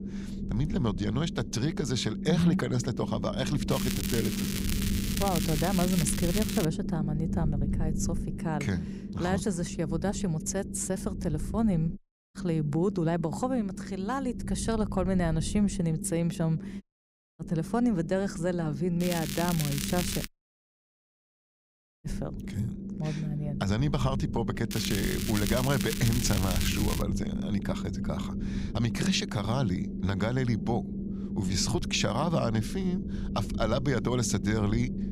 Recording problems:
low rumble; loud; throughout; 9 dB below the speech
crackling; loud; from 3.5 to 6.5 s, from 19 to 20 s and from 25 to 27 s; 5 dB below the speech
audio cutting out; at 12 s, at 17 s for 0.5 s and at 20 s for 2 s

